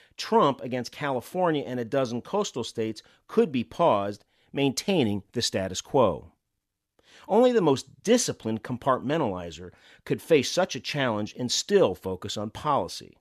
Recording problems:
none

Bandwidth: 13.5 kHz